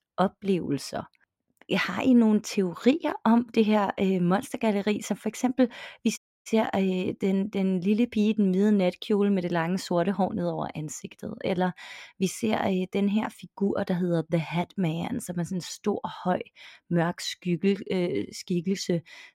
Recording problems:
audio cutting out; at 6 s

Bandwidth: 16 kHz